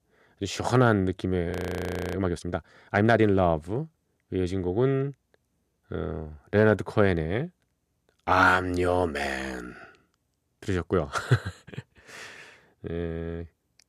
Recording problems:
audio freezing; at 1.5 s for 0.5 s

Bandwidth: 14.5 kHz